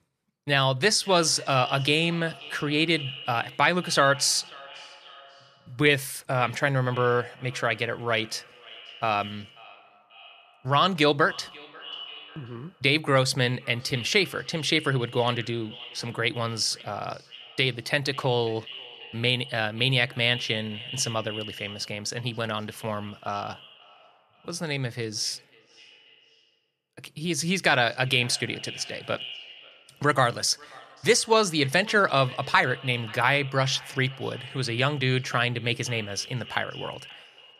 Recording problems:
echo of what is said; noticeable; throughout; 540 ms later, 15 dB below the speech

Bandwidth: 14.5 kHz